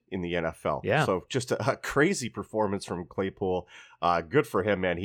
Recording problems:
abrupt cut into speech; at the end

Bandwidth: 18.5 kHz